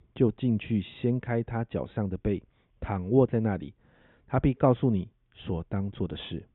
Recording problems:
high frequencies cut off; severe; nothing above 3.5 kHz

